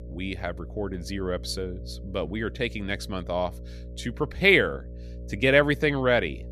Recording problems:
electrical hum; faint; throughout; 60 Hz, 25 dB below the speech

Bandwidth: 14.5 kHz